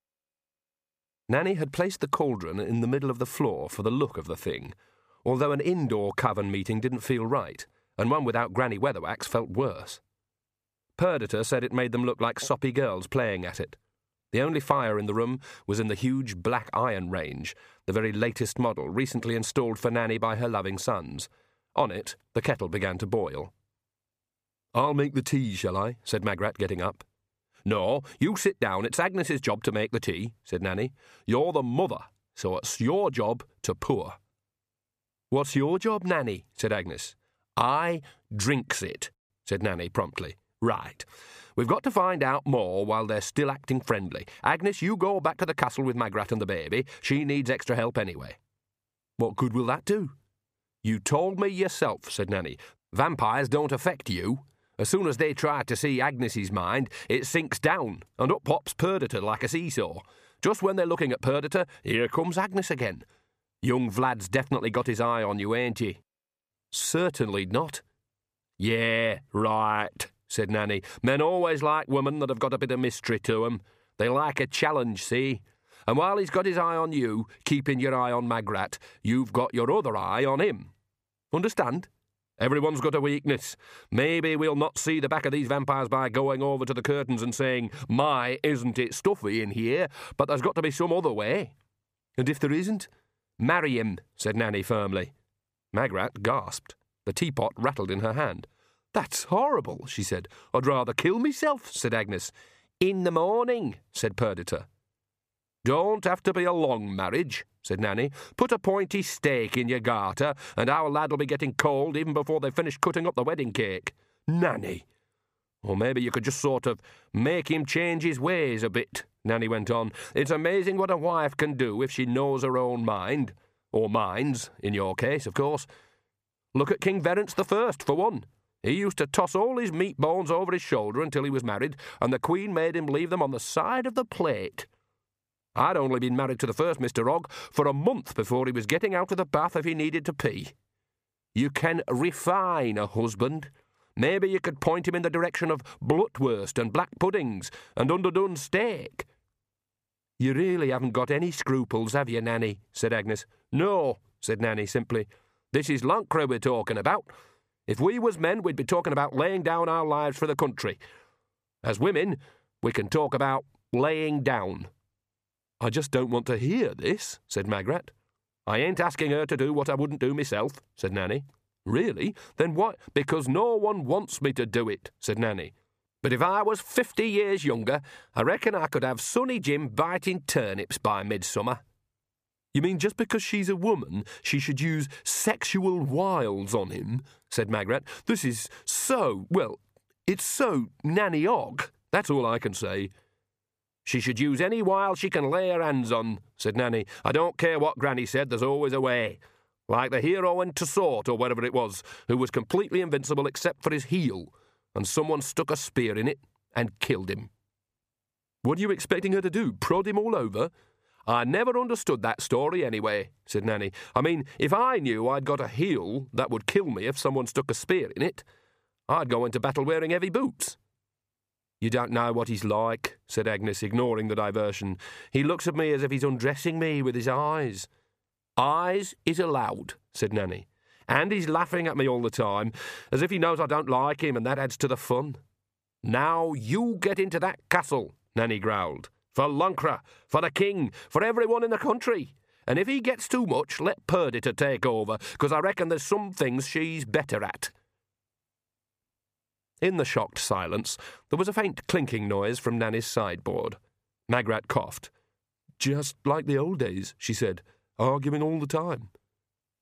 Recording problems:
none

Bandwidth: 15 kHz